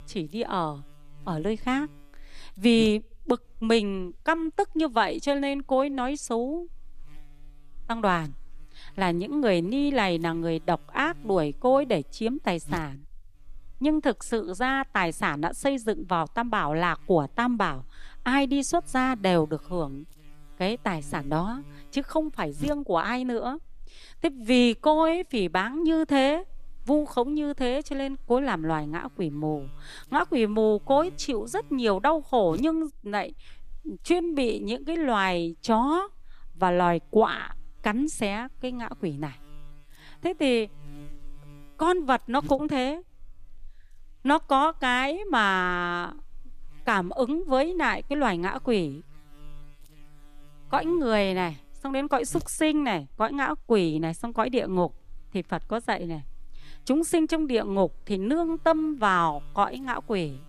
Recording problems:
electrical hum; faint; throughout; 50 Hz, 30 dB below the speech

